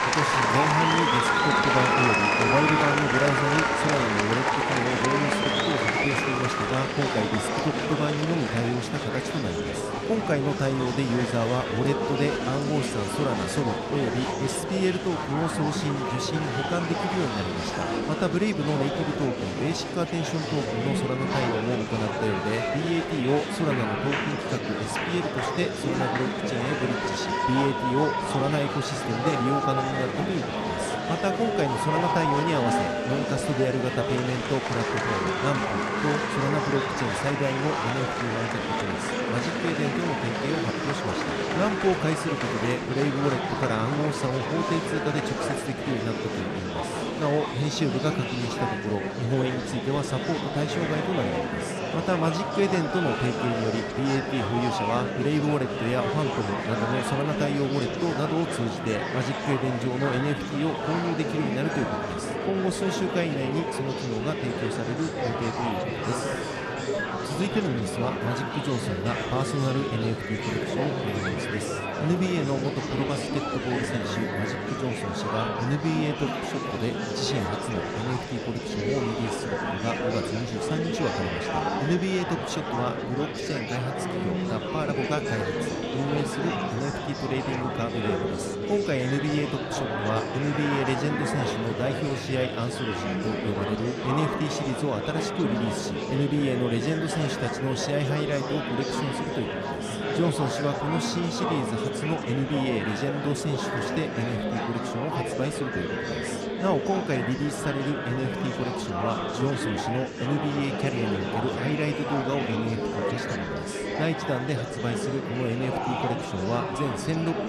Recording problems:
murmuring crowd; very loud; throughout; 1 dB above the speech

